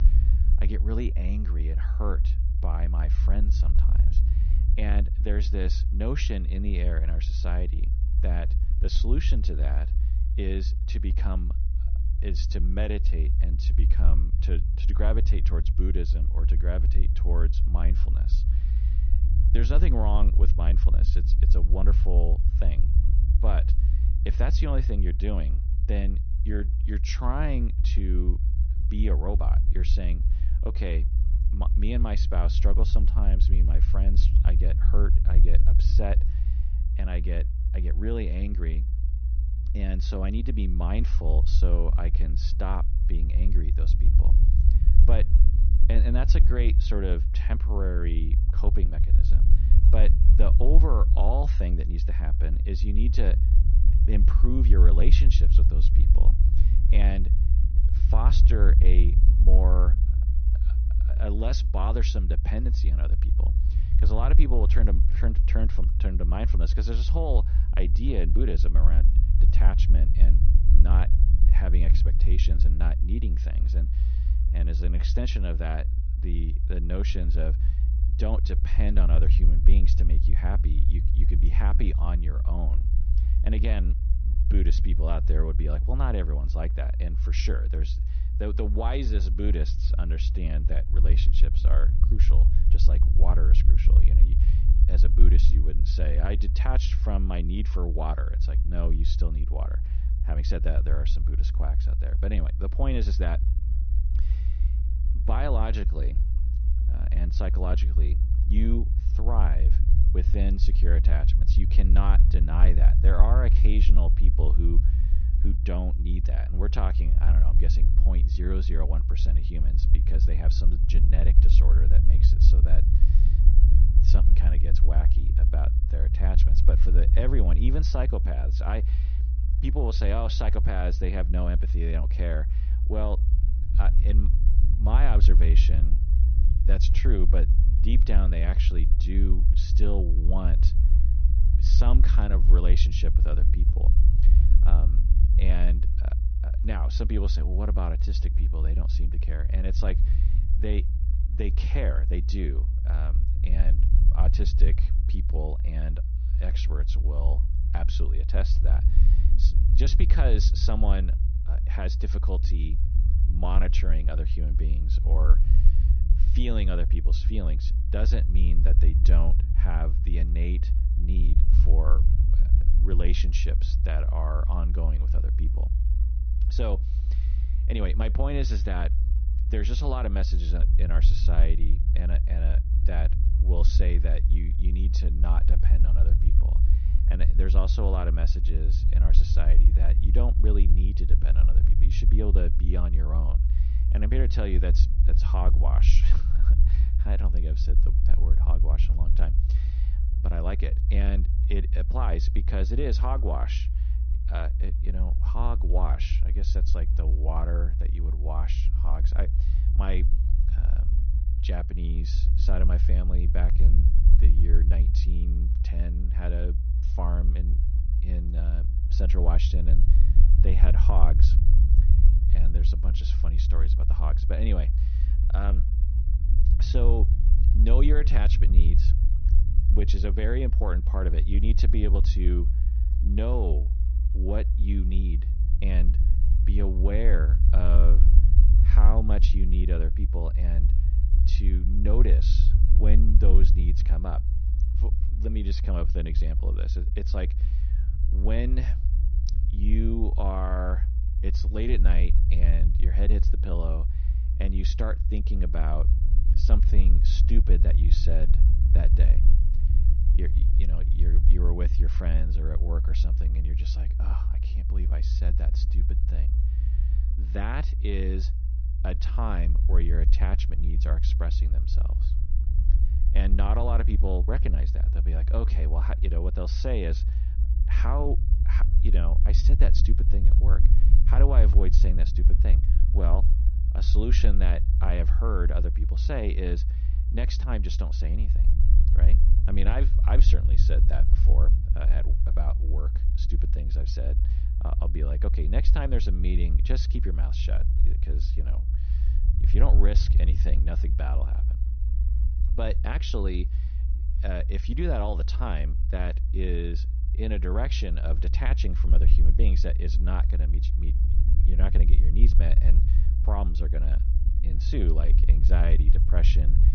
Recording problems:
high frequencies cut off; noticeable; nothing above 6 kHz
low rumble; loud; throughout; 7 dB below the speech

